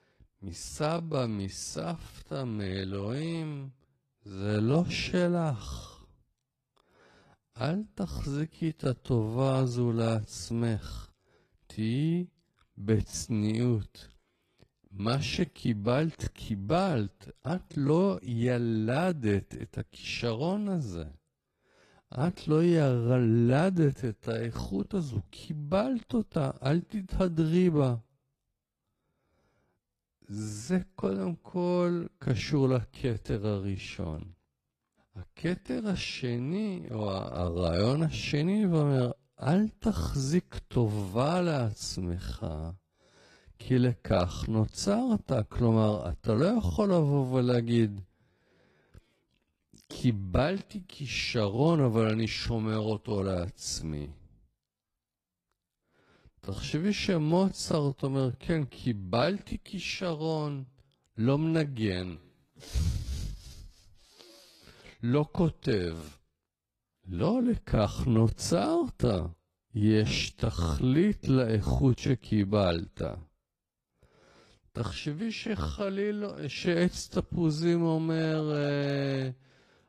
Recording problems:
wrong speed, natural pitch; too slow; 0.5 times normal speed
garbled, watery; slightly; nothing above 14 kHz

